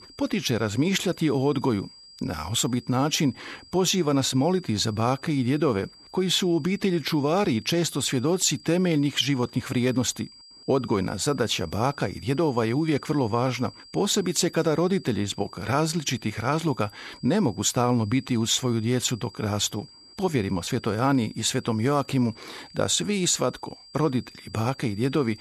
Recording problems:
high-pitched whine; faint; throughout; 5 kHz, 20 dB below the speech

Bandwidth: 13.5 kHz